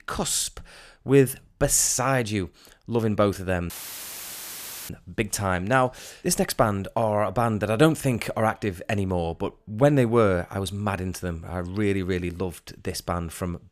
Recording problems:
audio cutting out; filled with static; at 3.5 s for 1 s

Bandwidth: 14.5 kHz